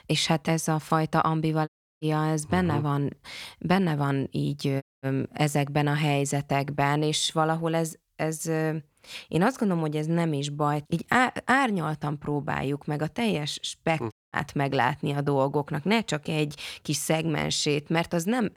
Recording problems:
audio cutting out; at 1.5 s, at 5 s and at 14 s

